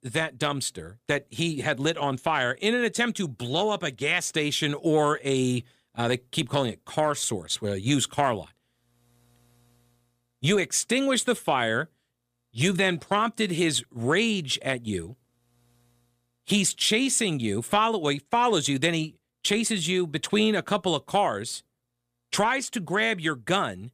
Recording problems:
none

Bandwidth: 15 kHz